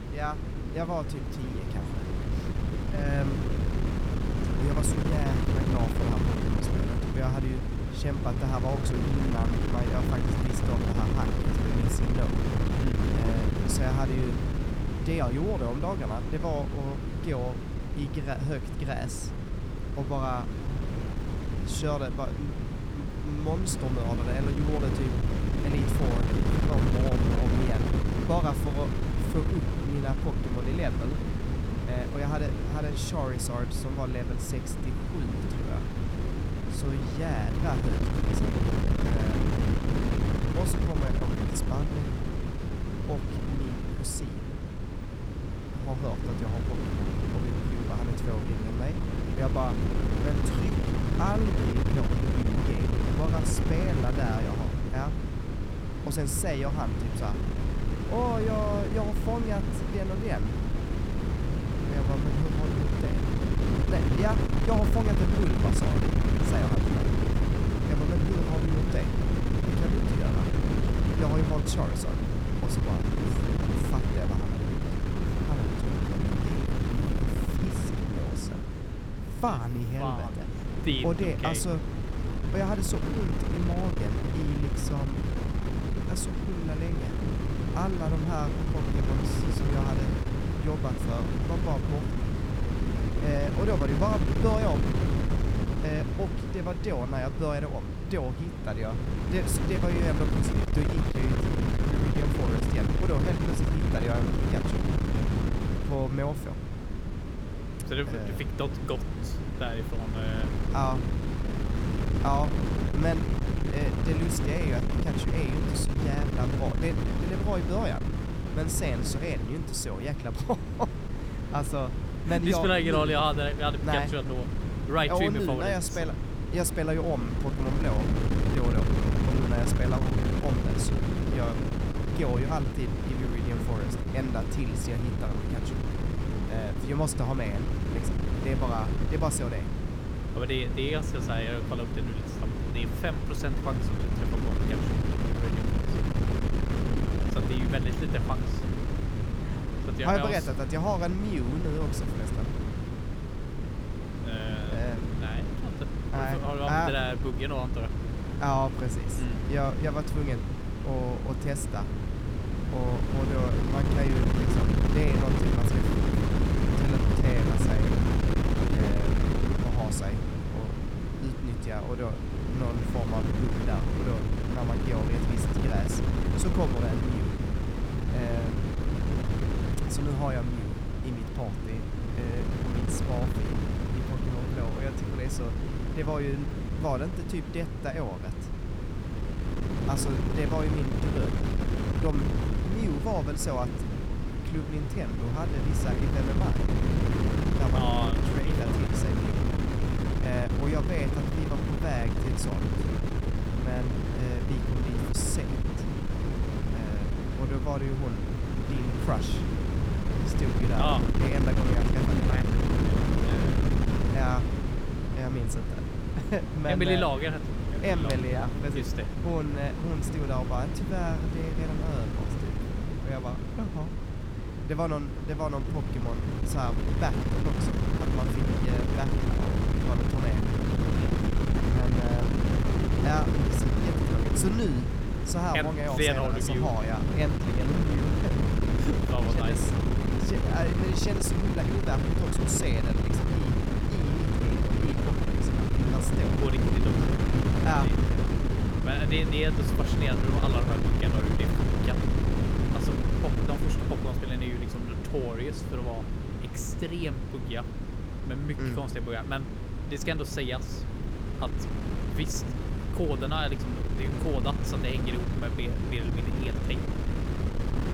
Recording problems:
wind noise on the microphone; heavy; 2 dB below the speech

